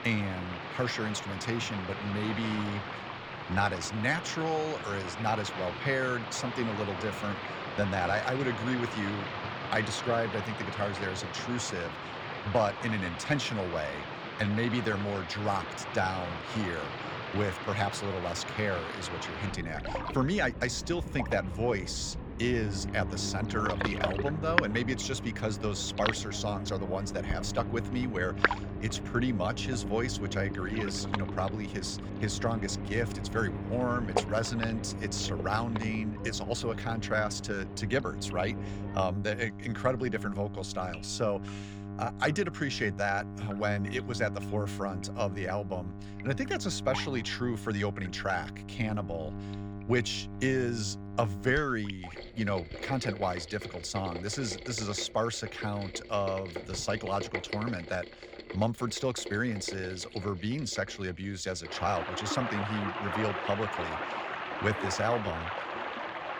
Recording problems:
rain or running water; loud; throughout; 5 dB below the speech
electrical hum; noticeable; from 22 to 52 s; 50 Hz, 15 dB below the speech

